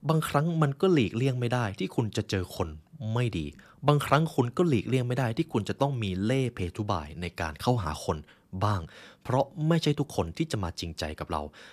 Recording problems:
none

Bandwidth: 14.5 kHz